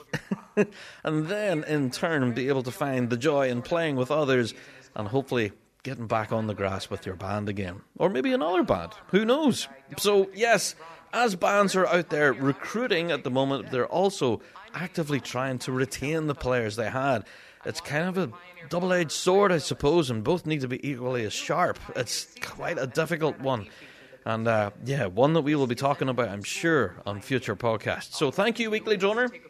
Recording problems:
voice in the background; faint; throughout; 20 dB below the speech

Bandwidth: 14 kHz